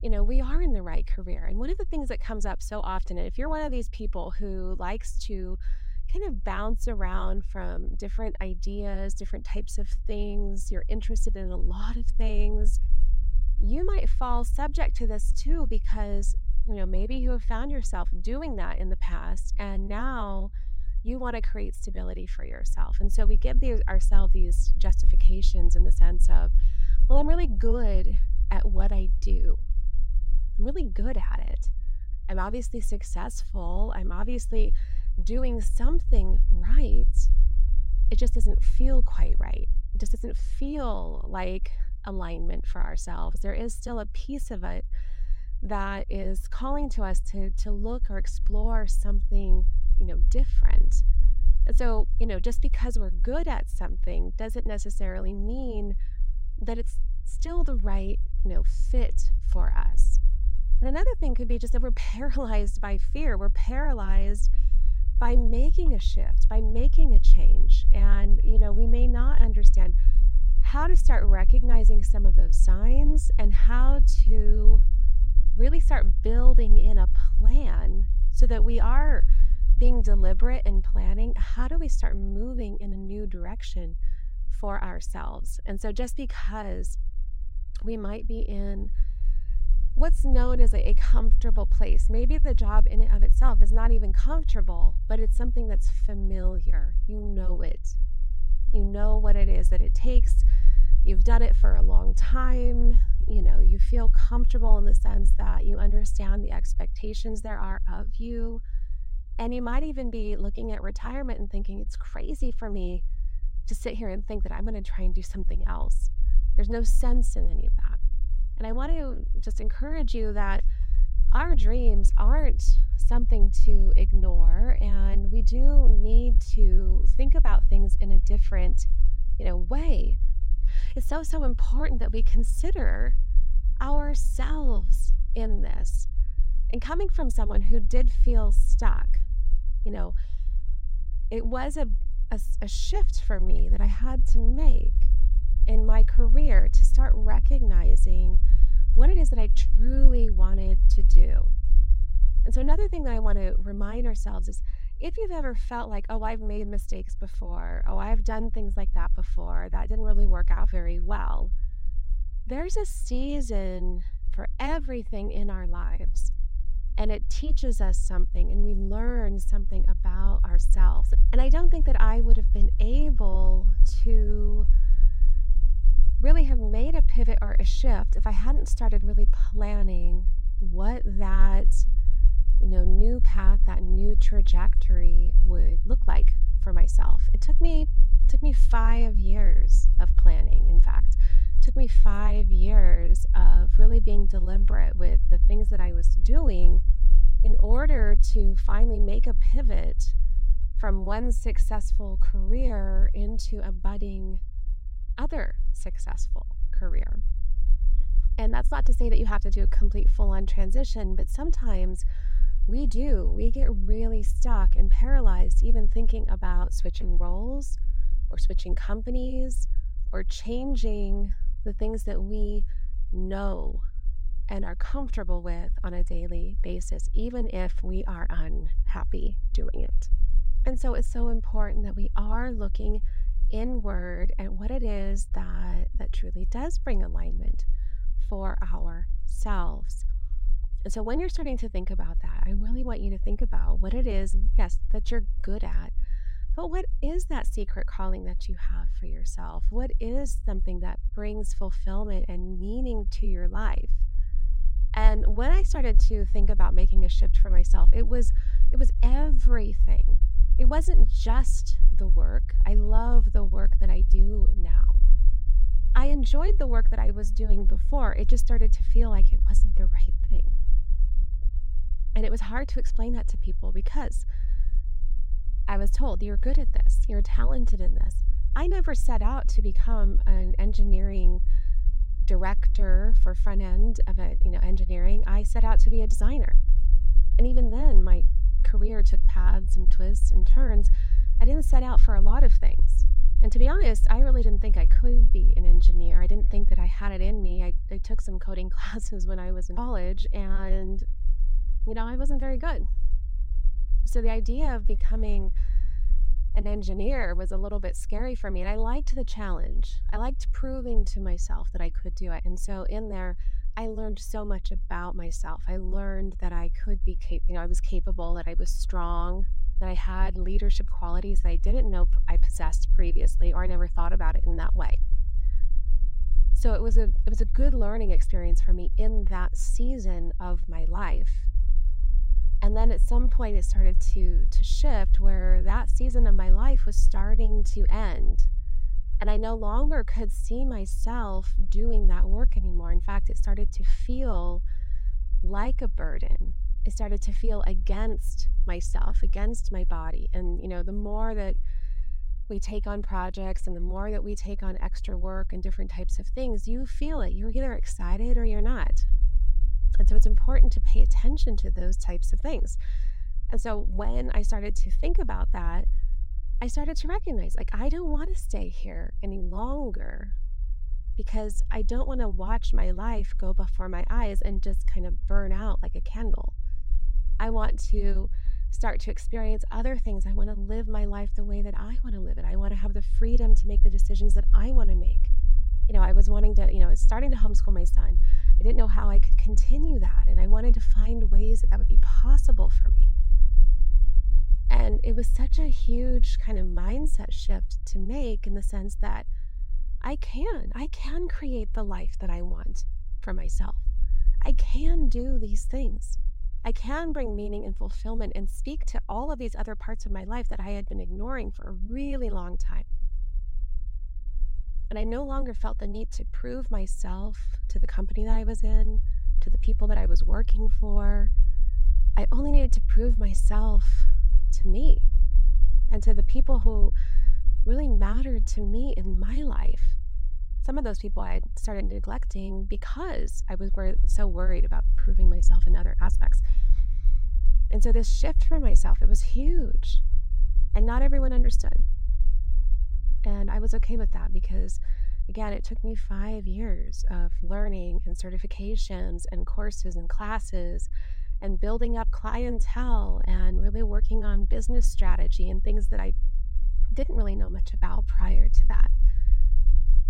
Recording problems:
low rumble; noticeable; throughout; 15 dB below the speech

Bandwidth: 16 kHz